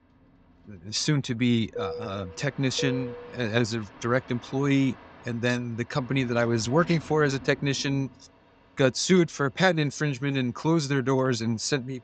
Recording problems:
high frequencies cut off; noticeable; nothing above 8 kHz
train or aircraft noise; noticeable; throughout; 15 dB below the speech

